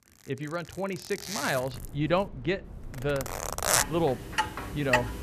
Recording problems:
household noises; very loud; throughout; 1 dB above the speech
low rumble; faint; from 1.5 to 4.5 s; 25 dB below the speech

